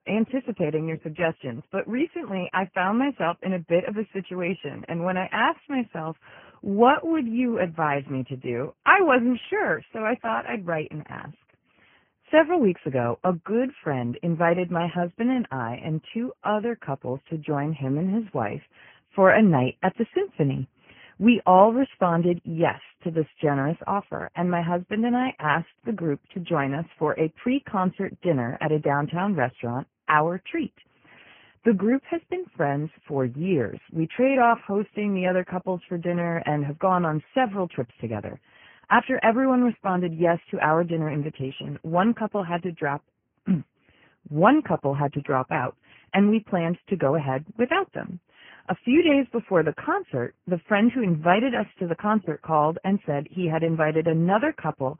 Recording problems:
garbled, watery; badly
high frequencies cut off; severe; nothing above 3 kHz

